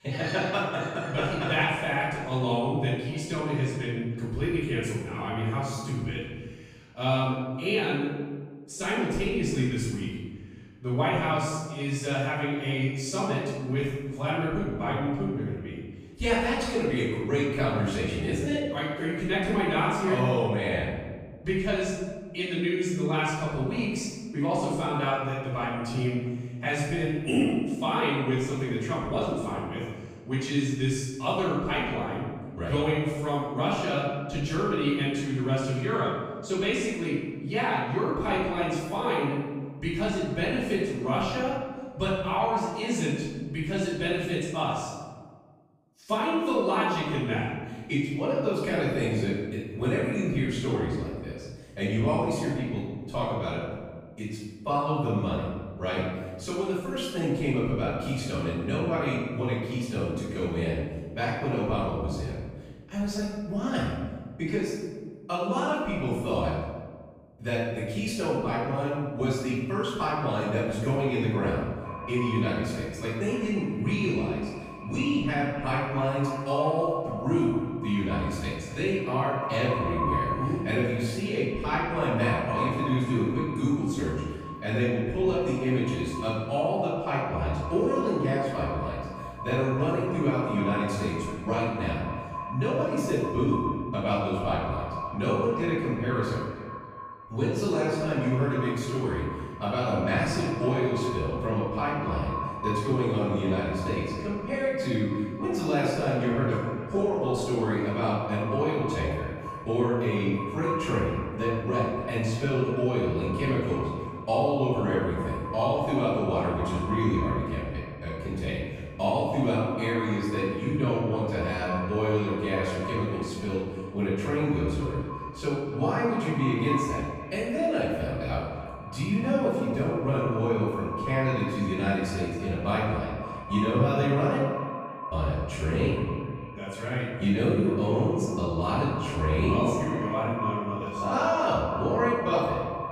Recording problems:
echo of what is said; strong; from 1:12 on; 280 ms later, 10 dB below the speech
room echo; strong; dies away in 1.4 s
off-mic speech; far

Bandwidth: 15 kHz